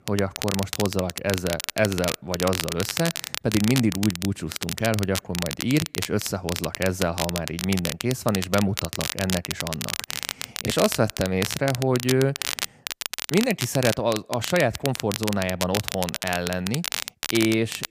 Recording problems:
crackle, like an old record; loud; 5 dB below the speech

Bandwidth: 15 kHz